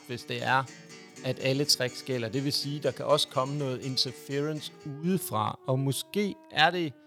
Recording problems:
background music; noticeable; throughout; 20 dB below the speech

